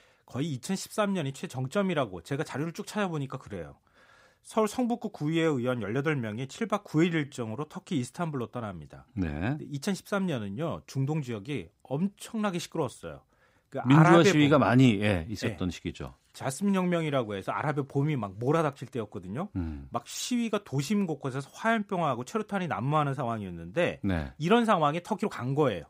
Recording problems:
uneven, jittery; slightly; from 3.5 to 25 s

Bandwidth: 15.5 kHz